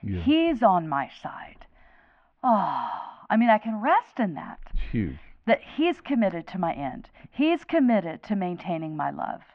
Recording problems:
muffled; very; fading above 2.5 kHz

